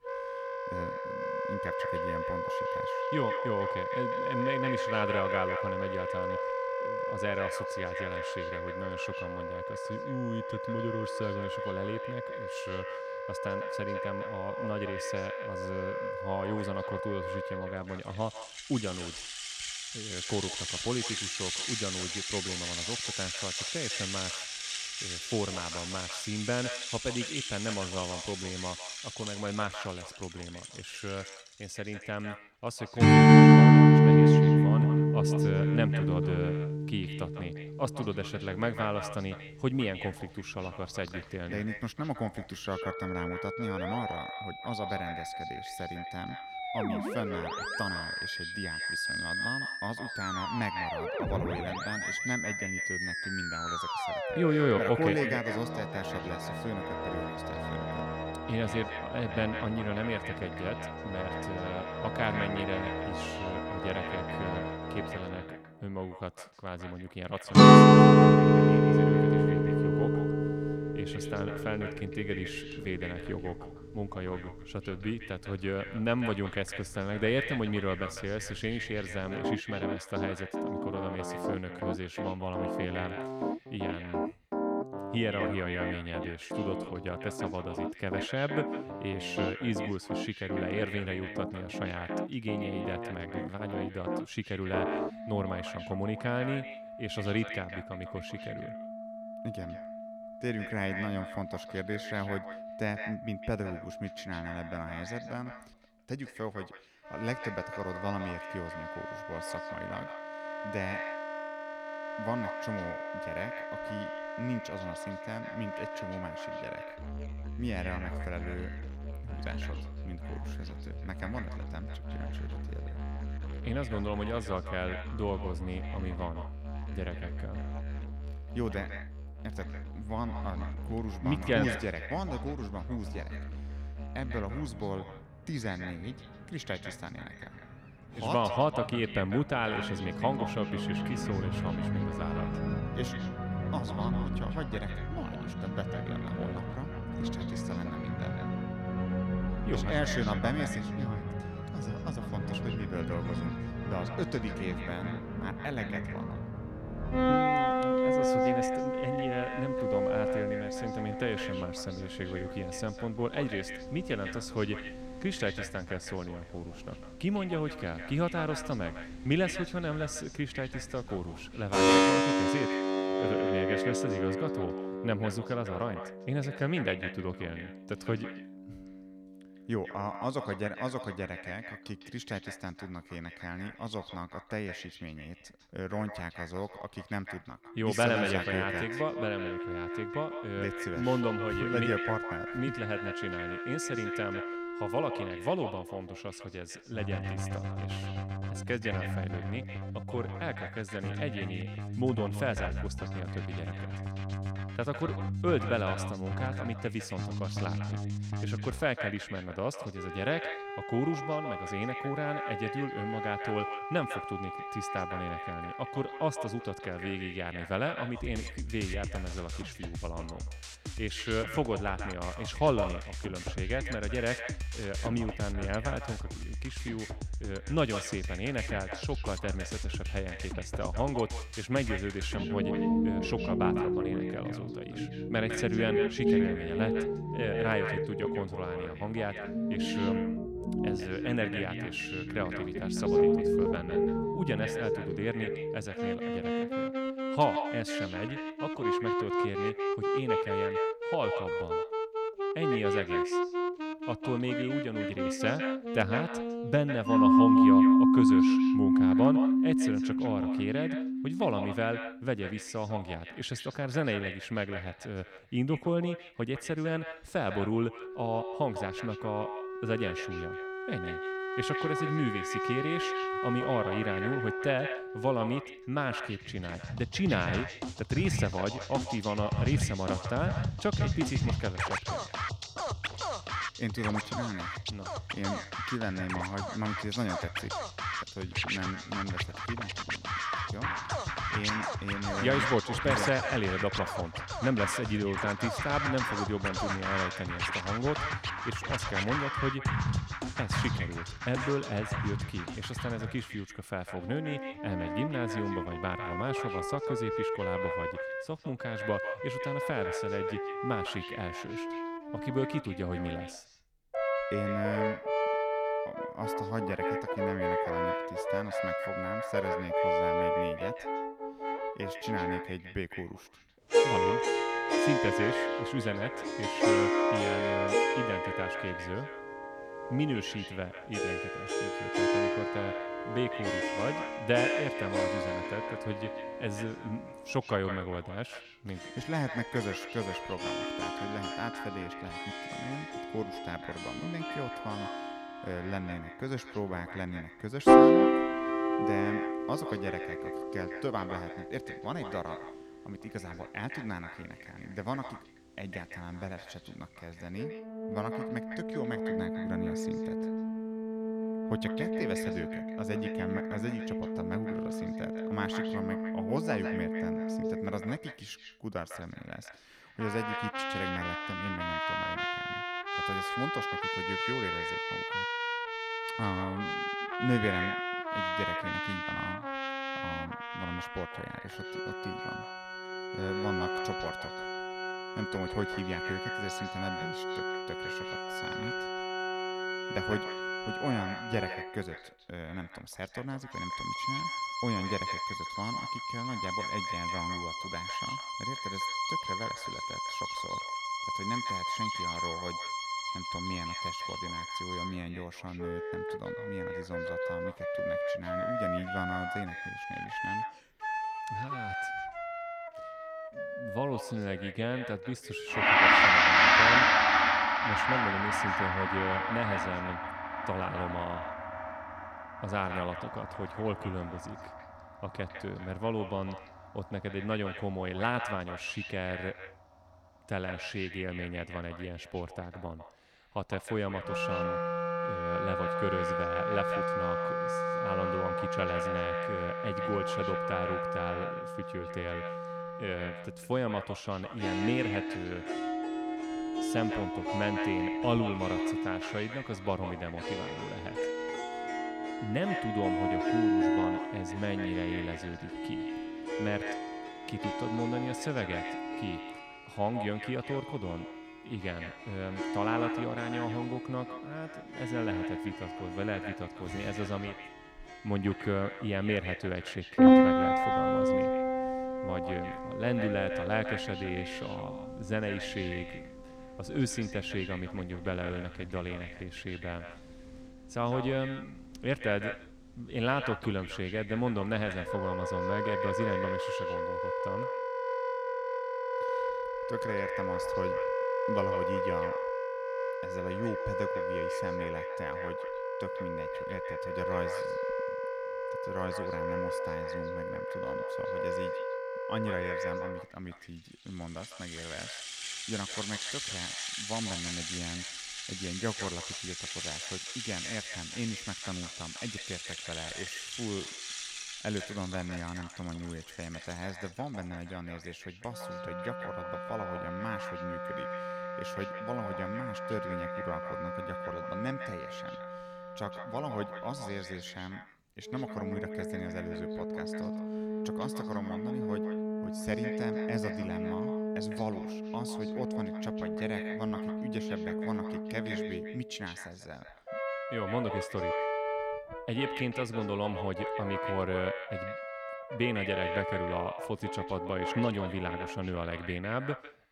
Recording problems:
echo of what is said; strong; throughout; 150 ms later, 9 dB below the speech
background music; very loud; throughout; 5 dB above the speech

